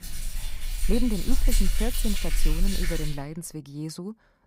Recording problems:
rain or running water; very loud; until 3 s; 2 dB above the speech

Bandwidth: 15.5 kHz